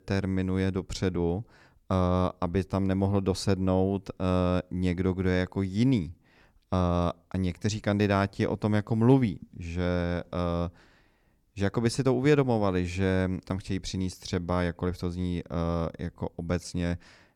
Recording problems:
none

